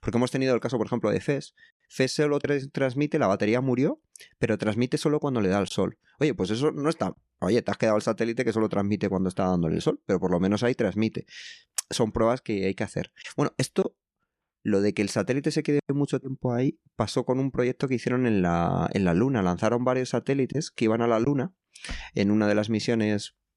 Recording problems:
none

